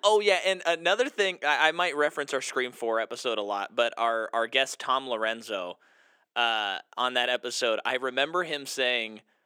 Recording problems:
thin; somewhat; fading below 350 Hz

